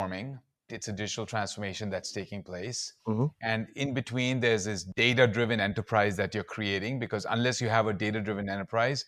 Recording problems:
abrupt cut into speech; at the start

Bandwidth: 14 kHz